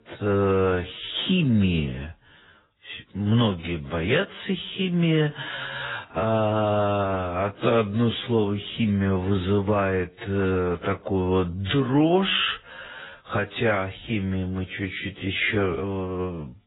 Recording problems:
garbled, watery; badly; nothing above 3.5 kHz
wrong speed, natural pitch; too slow; 0.6 times normal speed

